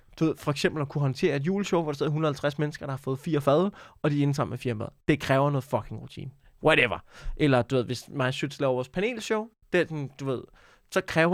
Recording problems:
abrupt cut into speech; at the end

